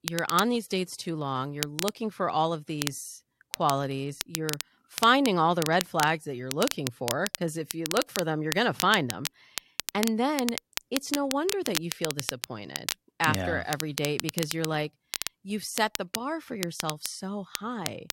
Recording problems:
crackle, like an old record; loud; 6 dB below the speech

